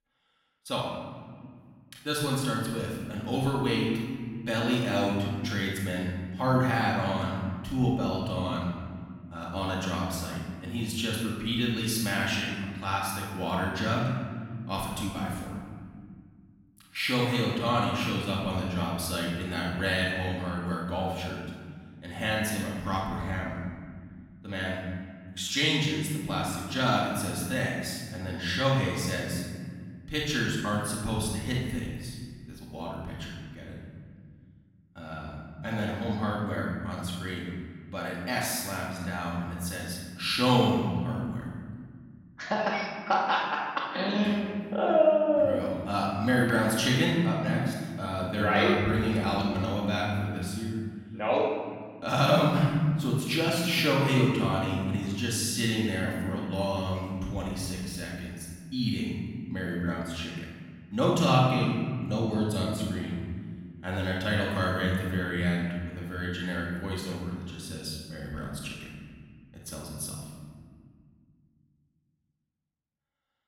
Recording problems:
off-mic speech; far
room echo; noticeable; dies away in 1.9 s

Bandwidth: 16.5 kHz